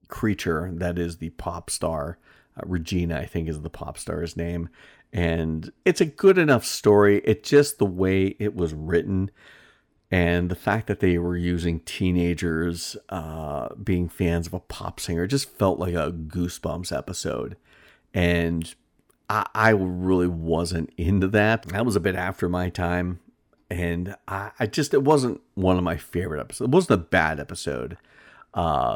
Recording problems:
abrupt cut into speech; at the end

